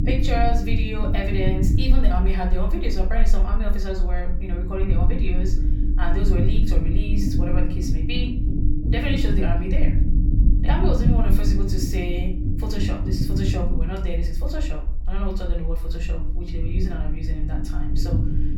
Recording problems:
off-mic speech; far
room echo; slight; dies away in 0.4 s
low rumble; loud; throughout; 4 dB below the speech

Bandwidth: 18.5 kHz